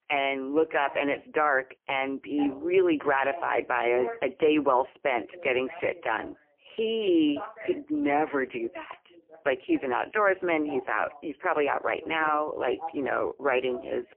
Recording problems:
phone-call audio; poor line; nothing above 3 kHz
voice in the background; noticeable; throughout; 15 dB below the speech

